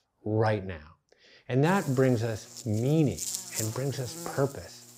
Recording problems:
electrical hum; loud; from 1.5 s on; 60 Hz, 9 dB below the speech

